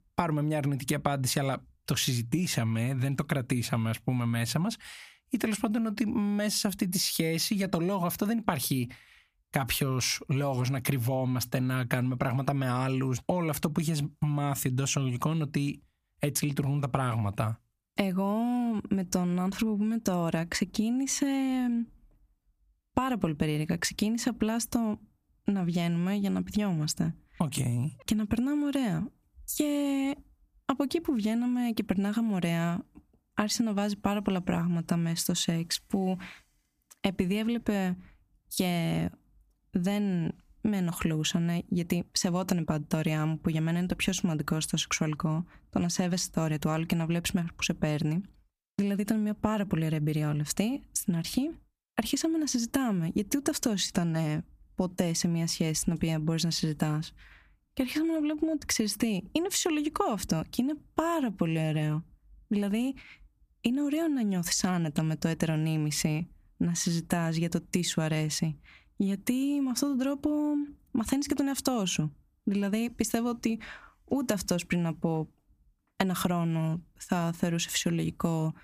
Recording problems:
squashed, flat; somewhat

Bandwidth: 15 kHz